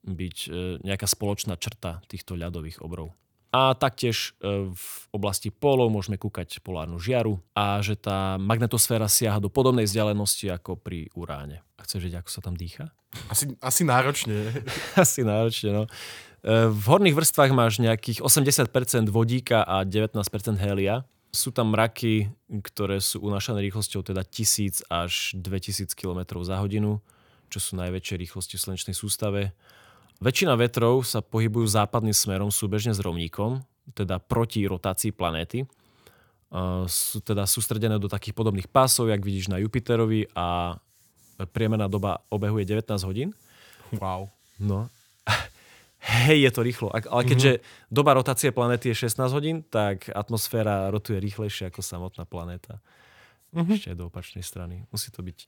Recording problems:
none

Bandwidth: 19 kHz